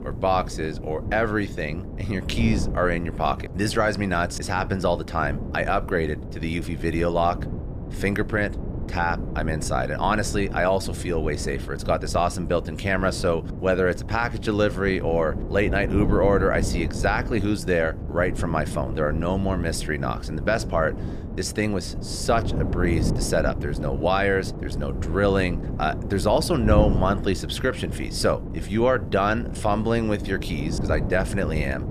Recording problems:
wind noise on the microphone; occasional gusts; 15 dB below the speech

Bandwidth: 14.5 kHz